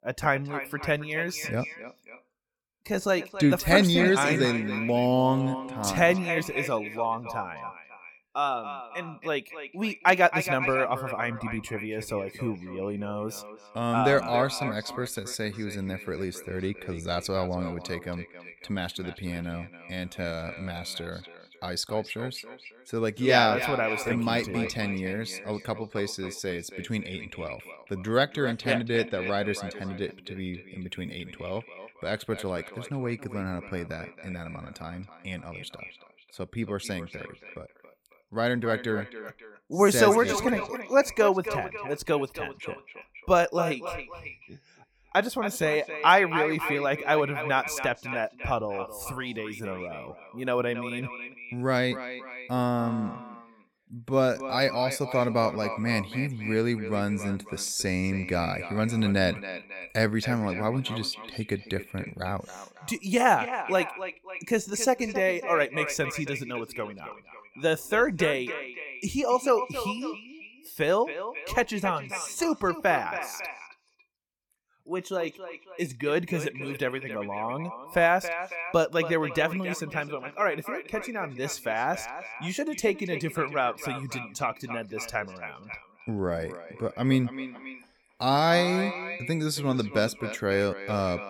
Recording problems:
echo of what is said; strong; throughout; 270 ms later, 10 dB below the speech

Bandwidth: 17.5 kHz